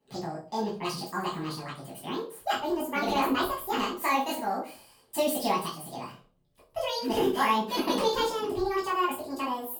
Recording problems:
off-mic speech; far
wrong speed and pitch; too fast and too high; 1.7 times normal speed
room echo; slight; dies away in 0.3 s

